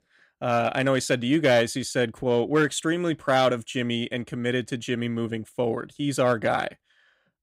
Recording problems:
none

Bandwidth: 15.5 kHz